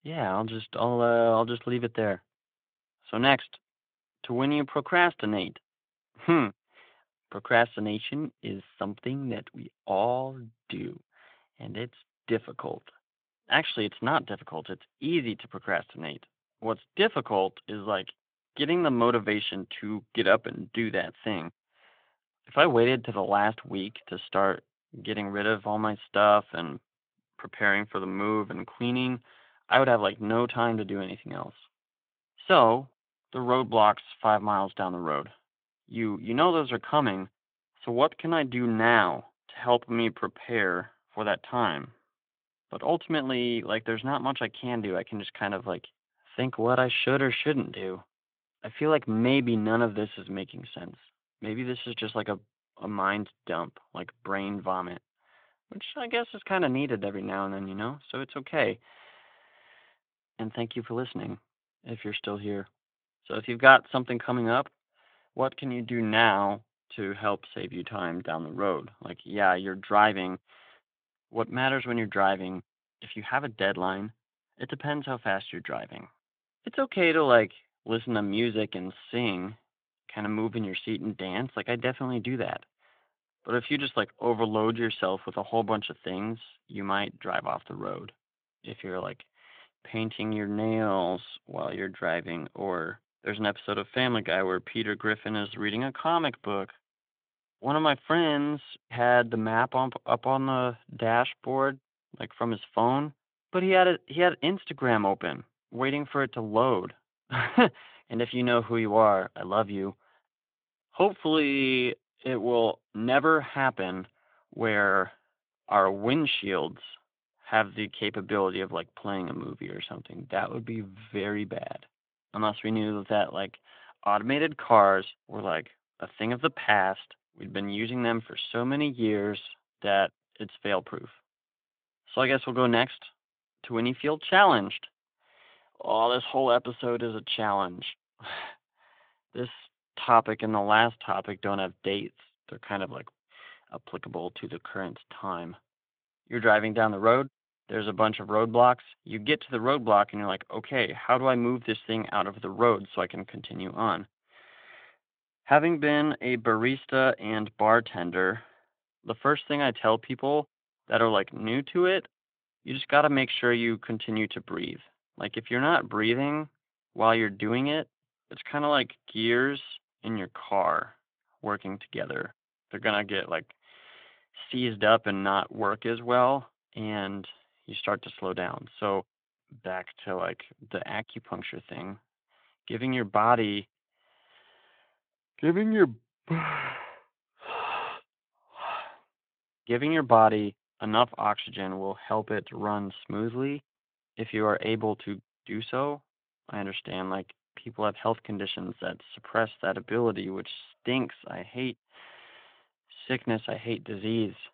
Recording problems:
phone-call audio

